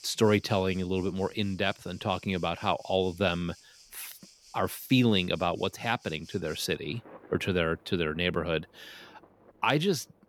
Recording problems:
rain or running water; faint; throughout; 25 dB below the speech

